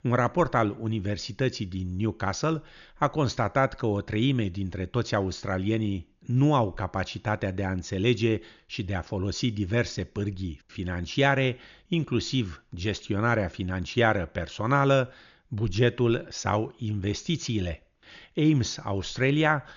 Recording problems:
high frequencies cut off; noticeable; nothing above 7 kHz

